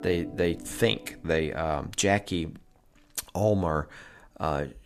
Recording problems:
background music; noticeable; throughout; 15 dB below the speech

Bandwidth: 14.5 kHz